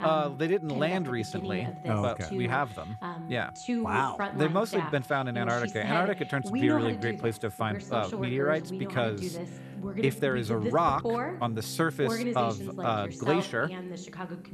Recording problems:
voice in the background; loud; throughout; 5 dB below the speech
background music; noticeable; throughout; 15 dB below the speech

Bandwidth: 13.5 kHz